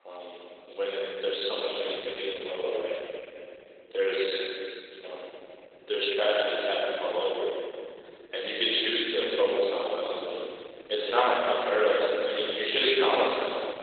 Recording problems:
room echo; strong; dies away in 3 s
off-mic speech; far
garbled, watery; badly; nothing above 4 kHz
thin; very; fading below 400 Hz

